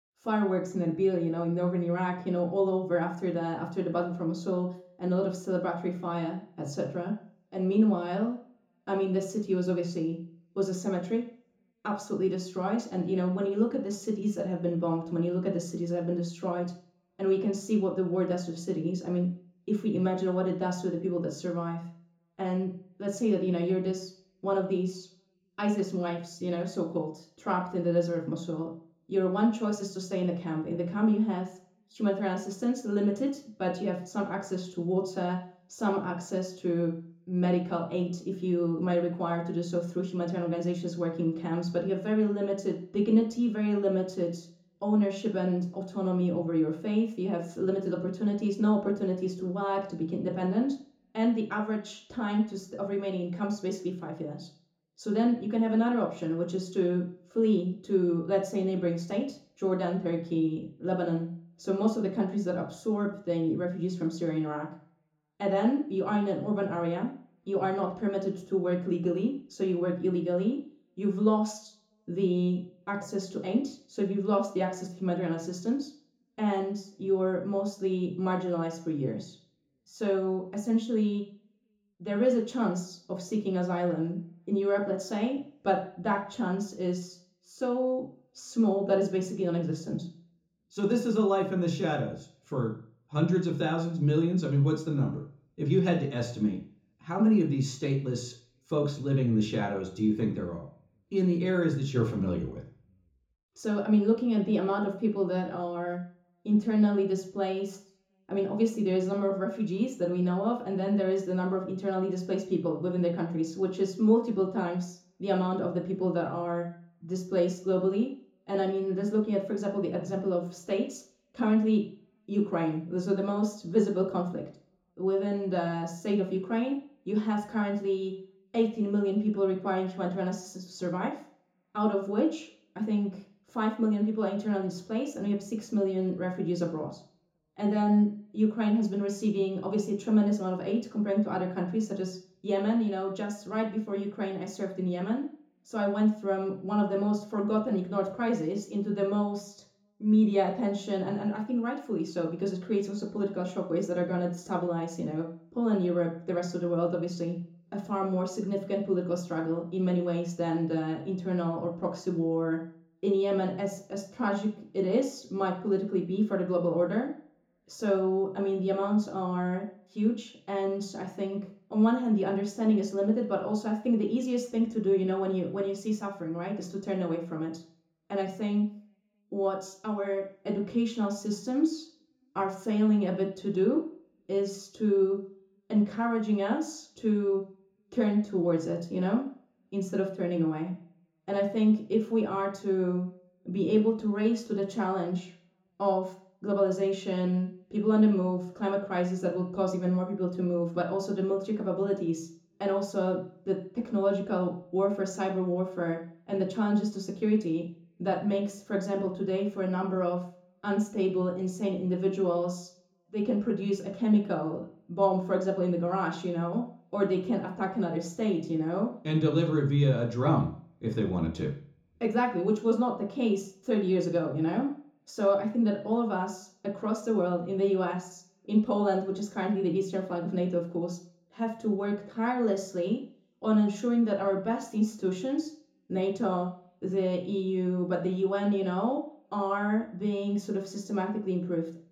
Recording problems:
off-mic speech; far
room echo; slight; dies away in 0.6 s

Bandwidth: 18.5 kHz